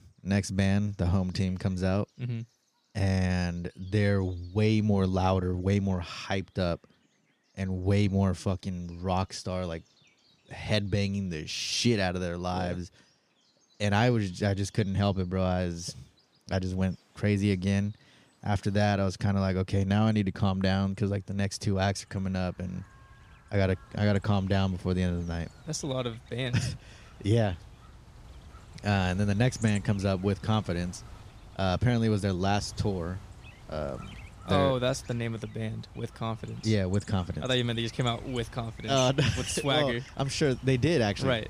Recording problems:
animal sounds; noticeable; throughout; 20 dB below the speech

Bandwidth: 15 kHz